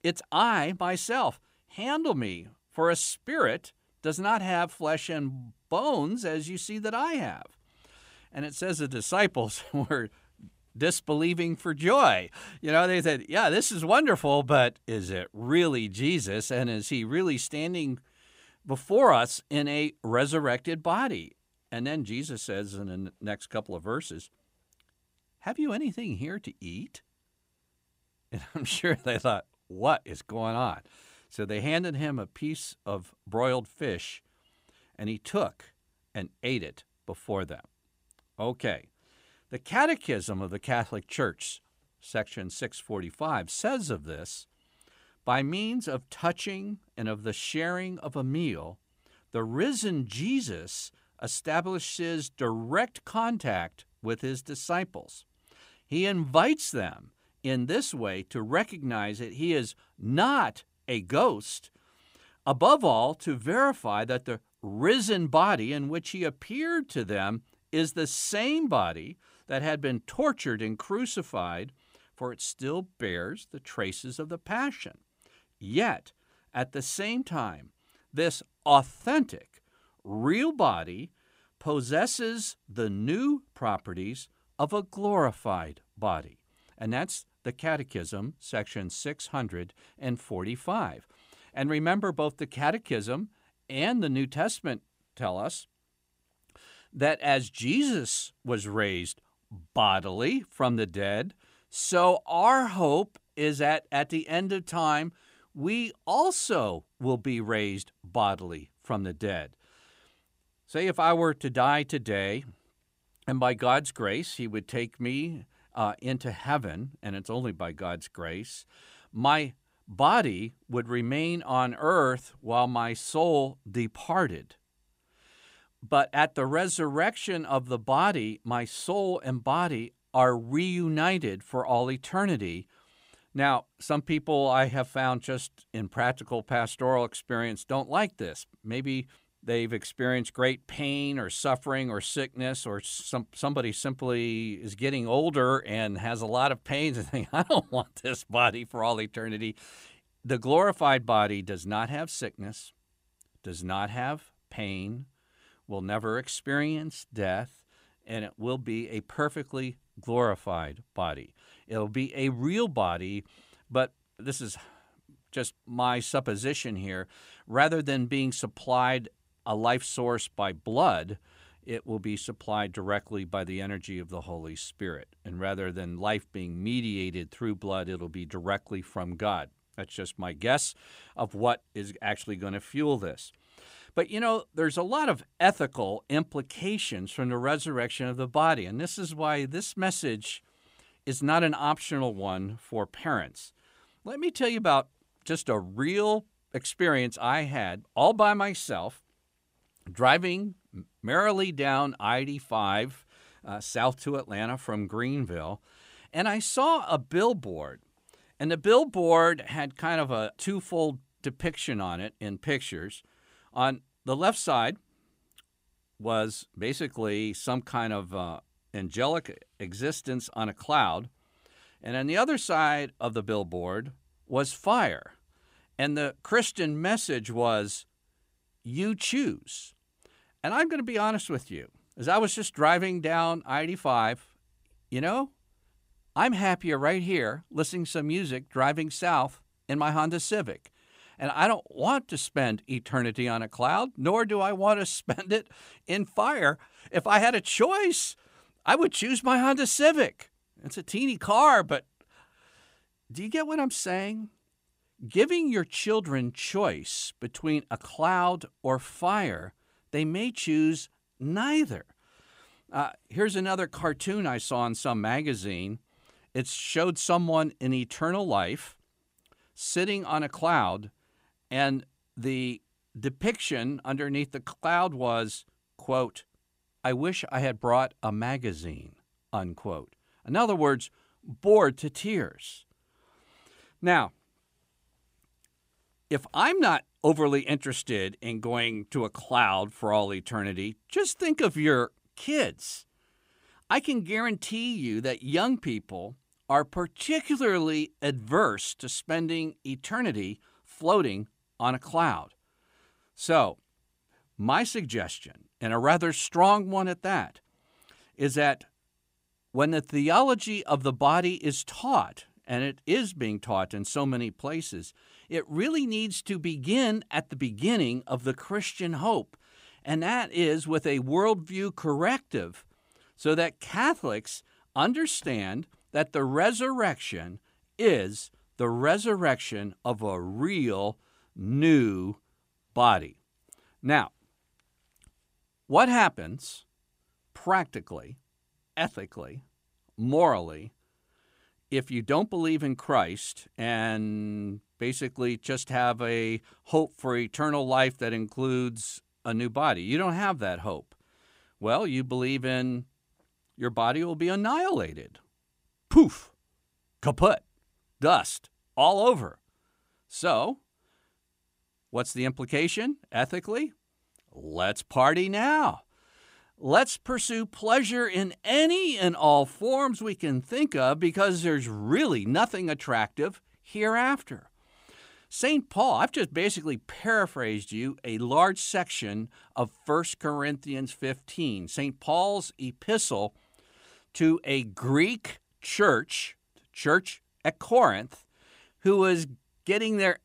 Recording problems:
none

